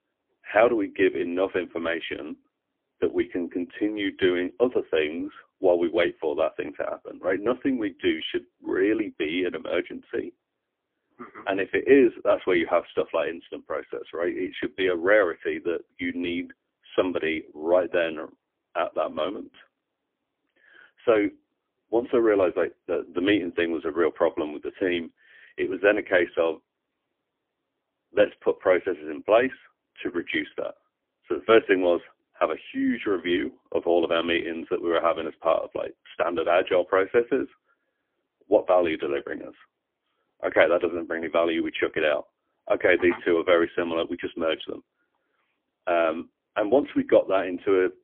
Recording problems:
phone-call audio; poor line; nothing above 3.5 kHz

